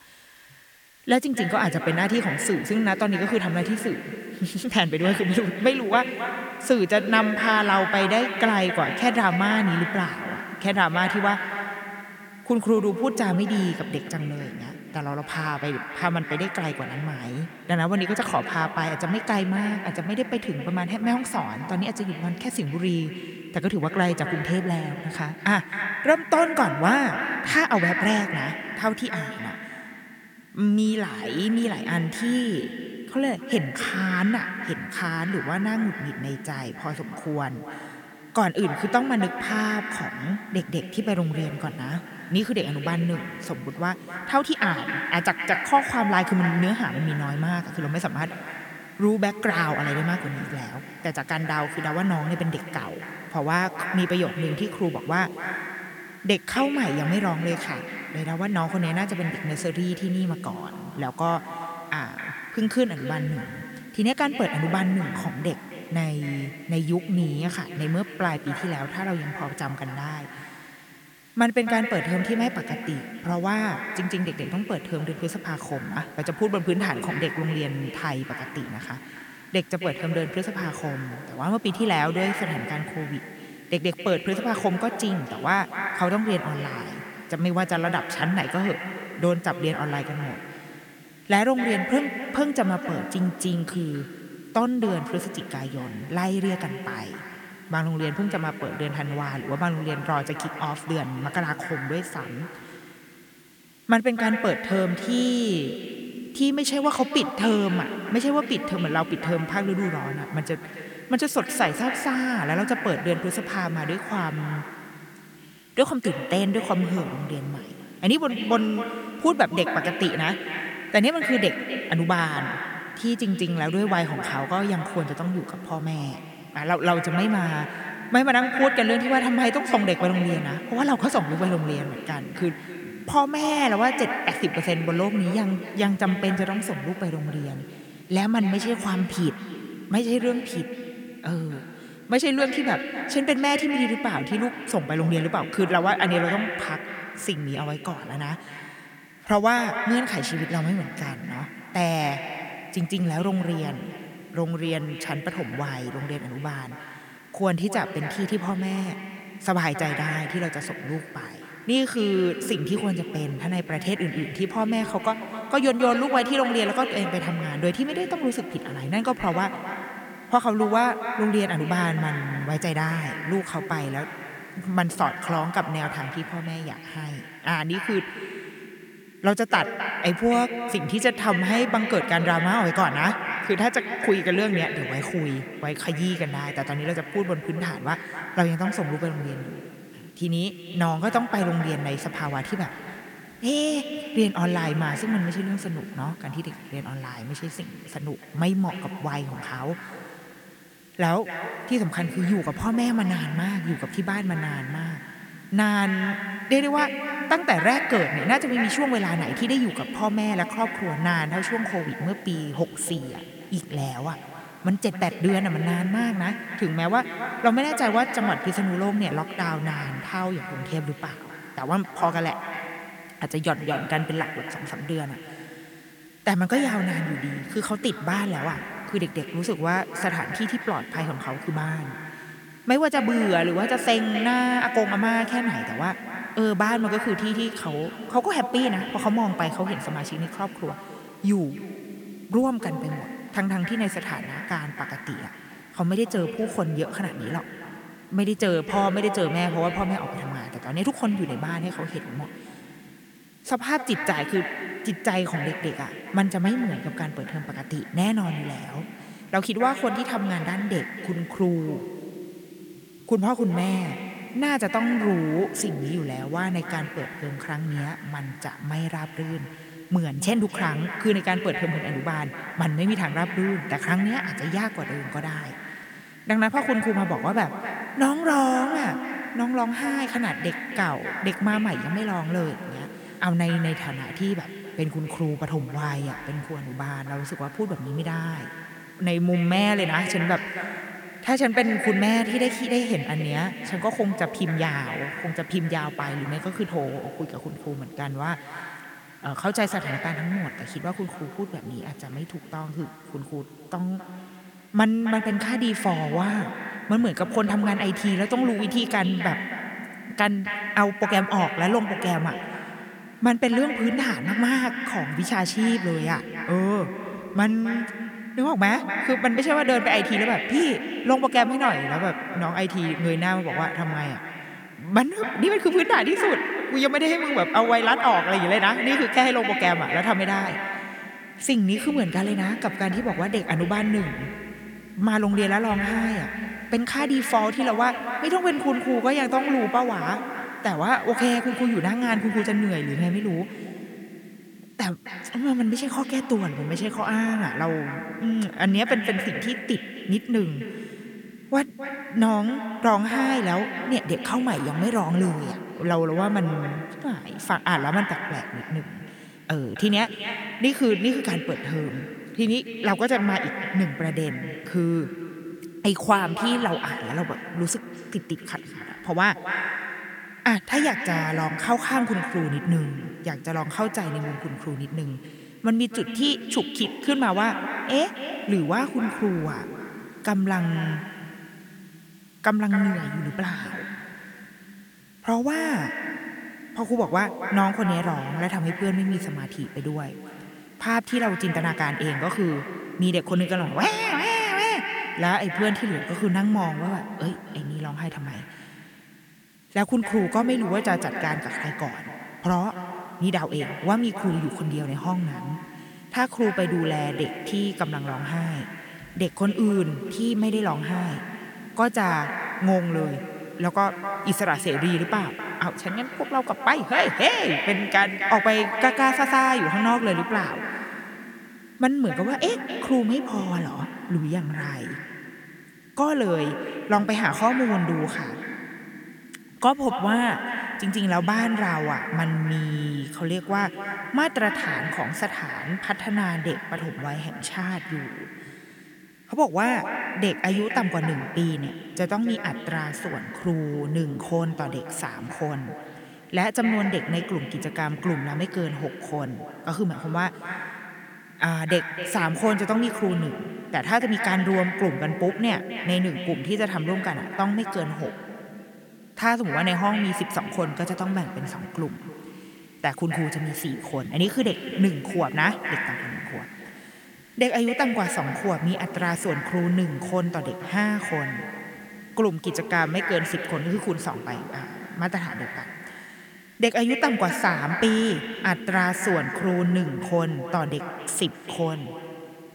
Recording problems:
echo of what is said; strong; throughout; 260 ms later, 7 dB below the speech
hiss; faint; throughout; 30 dB below the speech

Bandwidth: 18.5 kHz